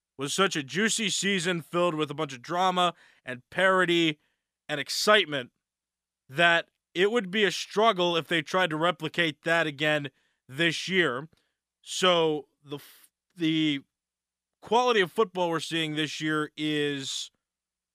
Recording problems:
none

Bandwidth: 15 kHz